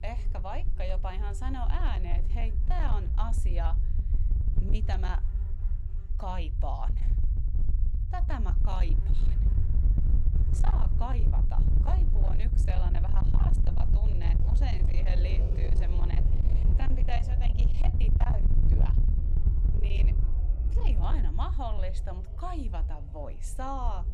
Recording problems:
distortion; slight; 16% of the sound clipped
low rumble; loud; throughout; 6 dB below the speech
animal sounds; noticeable; throughout; 10 dB below the speech

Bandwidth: 15.5 kHz